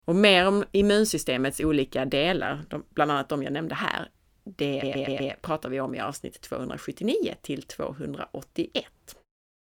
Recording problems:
audio stuttering; at 4.5 s

